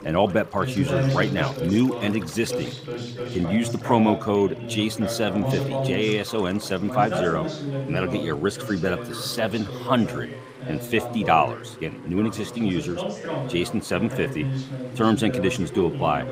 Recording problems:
background chatter; loud; throughout; 2 voices, 6 dB below the speech
rain or running water; faint; throughout; 25 dB below the speech

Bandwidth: 15.5 kHz